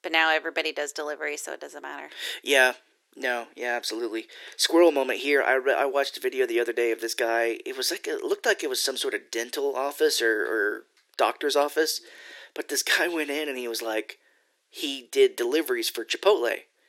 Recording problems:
thin; very; fading below 350 Hz

